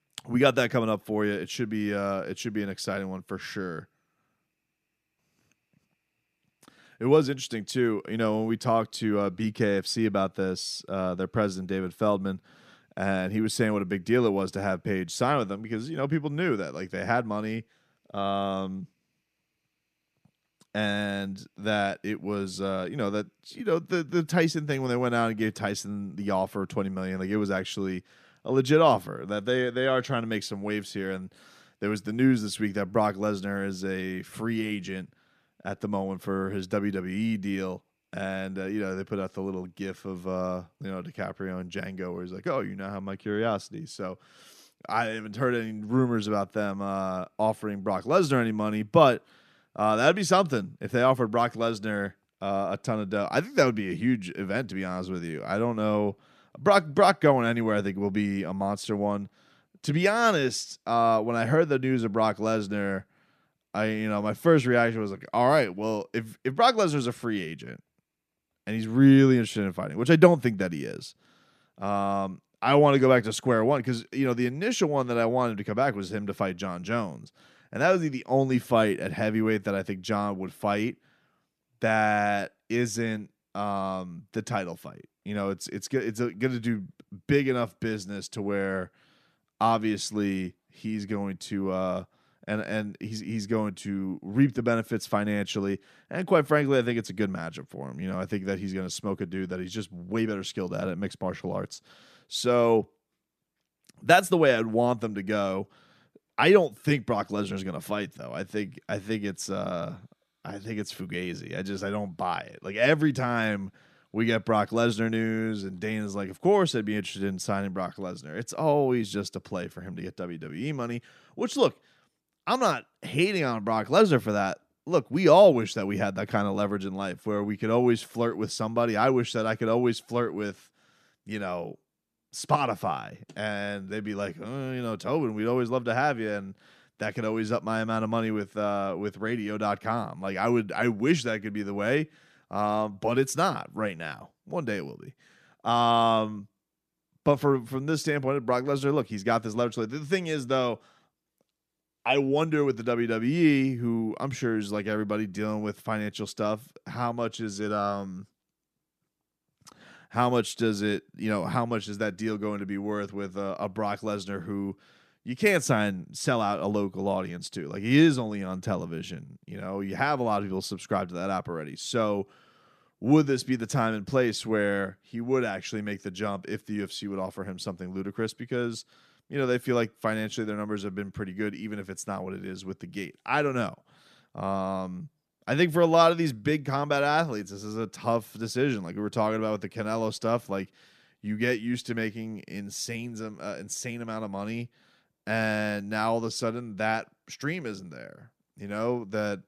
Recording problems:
none

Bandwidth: 14.5 kHz